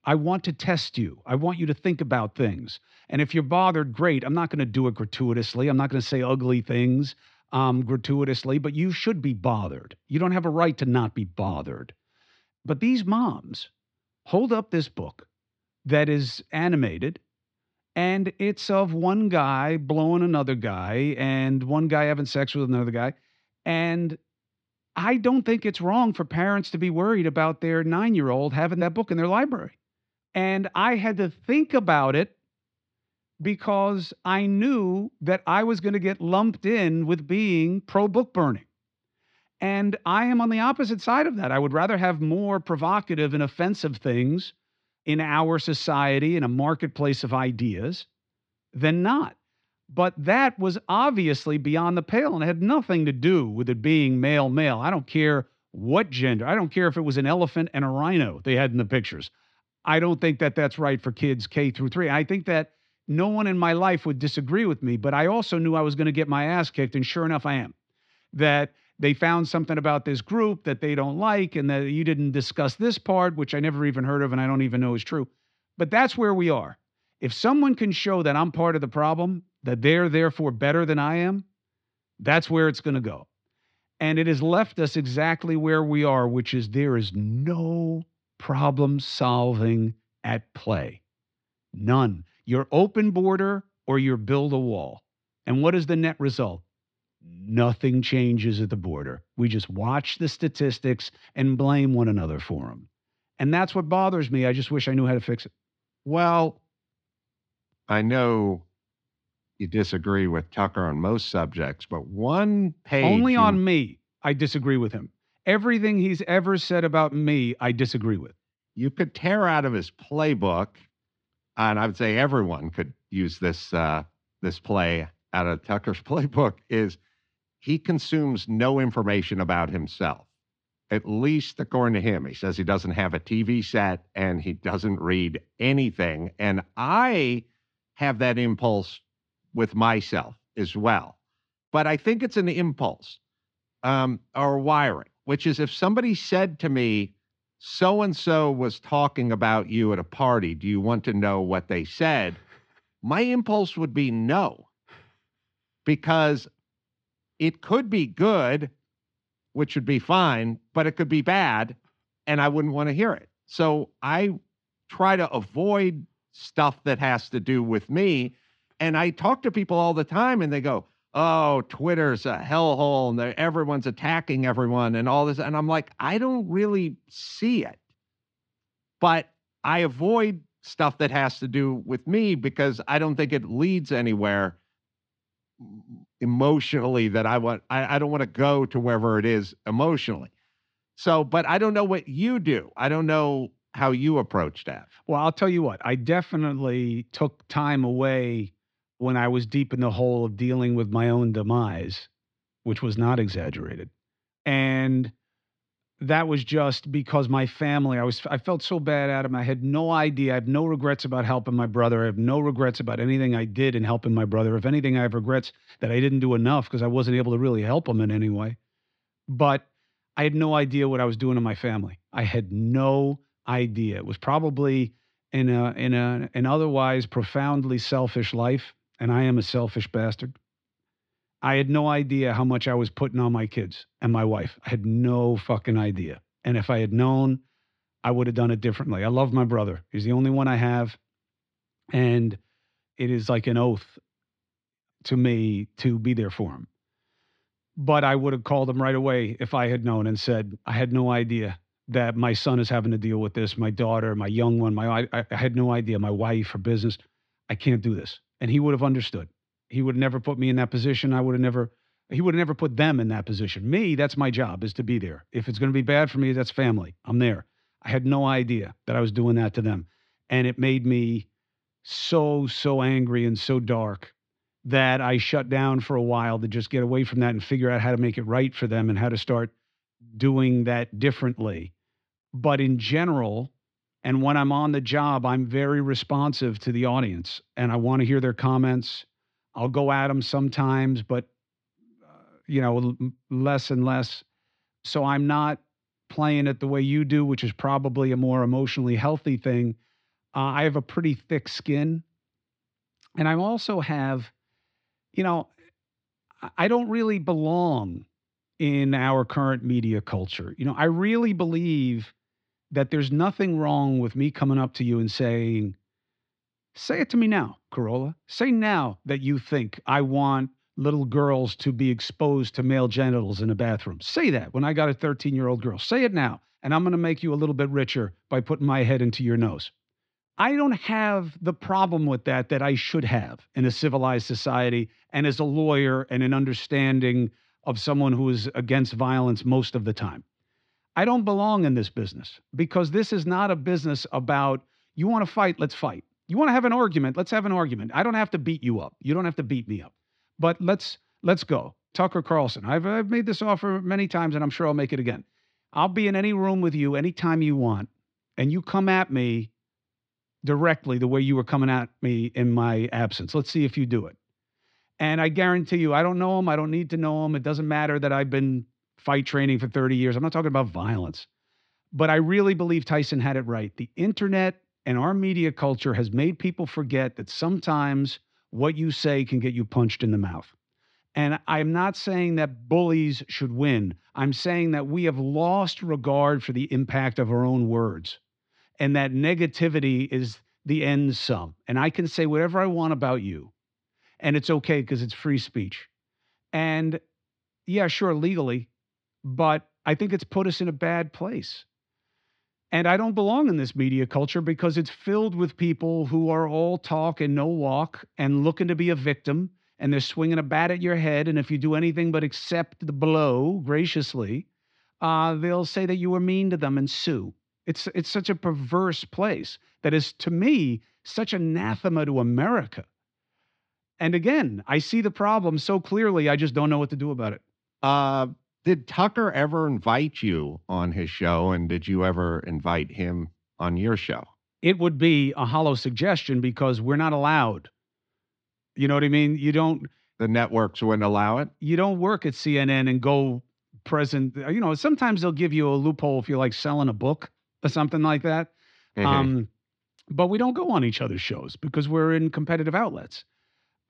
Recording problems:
muffled; very slightly; fading above 4 kHz

